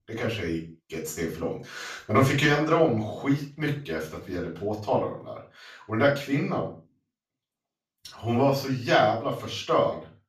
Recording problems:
off-mic speech; far
room echo; noticeable; dies away in 0.3 s

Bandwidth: 15 kHz